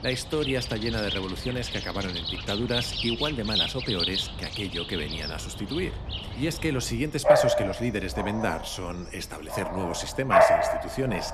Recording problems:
animal sounds; very loud; throughout; 3 dB above the speech

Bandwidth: 13.5 kHz